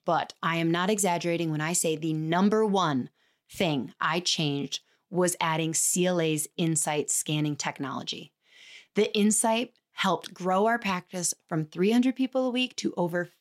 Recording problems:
none

